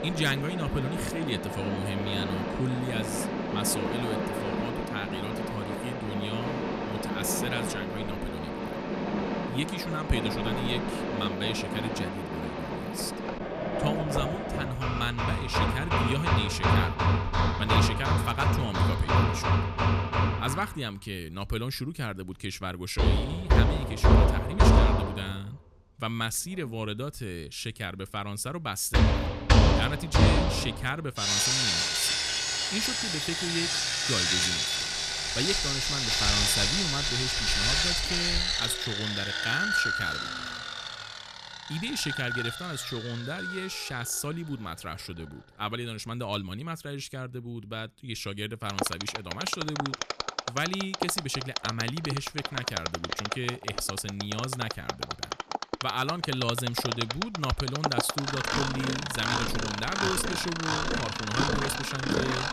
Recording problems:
machinery noise; very loud; throughout; 5 dB above the speech

